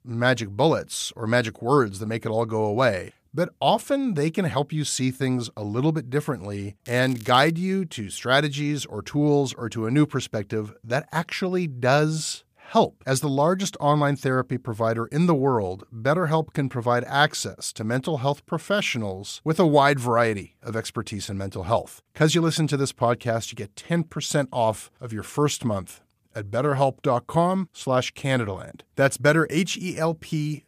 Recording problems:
crackling; faint; at 7 s; 20 dB below the speech

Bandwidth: 15 kHz